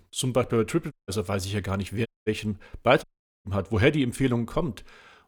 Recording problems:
audio cutting out; at 1 s, at 2 s and at 3 s

